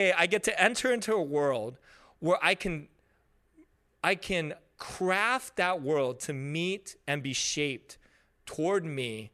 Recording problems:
abrupt cut into speech; at the start

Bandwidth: 13.5 kHz